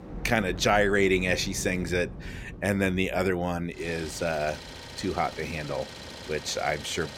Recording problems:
rain or running water; noticeable; throughout; 15 dB below the speech
traffic noise; noticeable; throughout; 15 dB below the speech

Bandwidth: 17 kHz